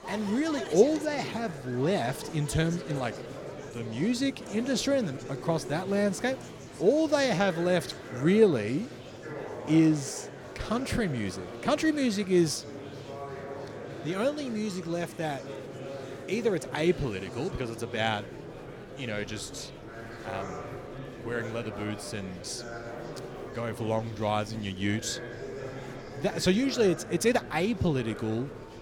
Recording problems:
murmuring crowd; noticeable; throughout; 10 dB below the speech

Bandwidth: 17 kHz